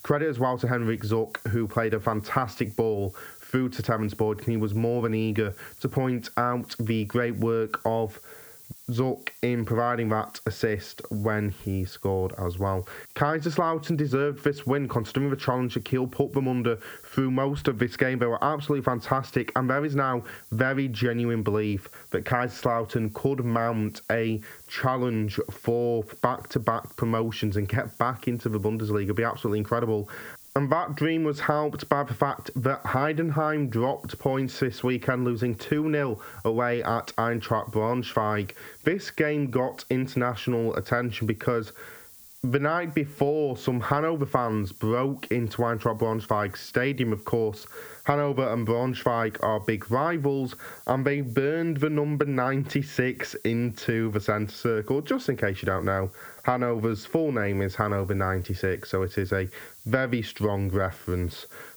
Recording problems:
squashed, flat; heavily
muffled; very slightly; fading above 2 kHz
hiss; faint; throughout; 20 dB below the speech

